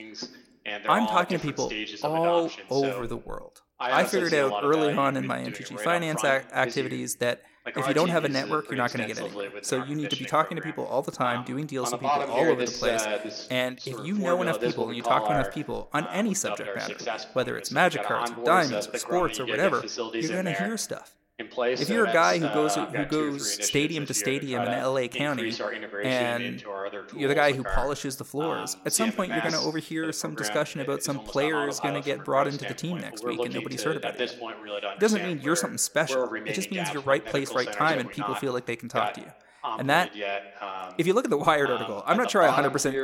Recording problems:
voice in the background; loud; throughout; 5 dB below the speech

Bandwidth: 16.5 kHz